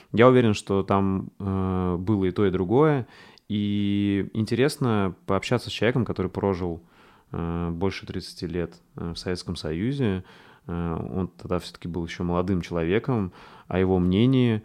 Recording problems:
none

